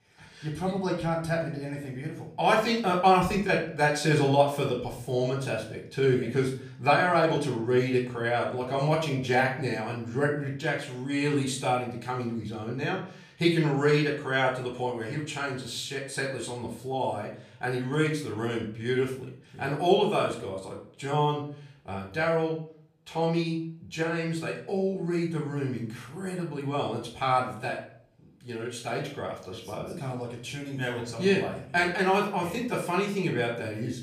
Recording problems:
off-mic speech; far
room echo; slight; dies away in 0.4 s

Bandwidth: 15 kHz